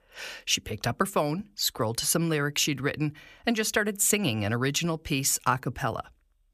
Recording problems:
none

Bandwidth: 14.5 kHz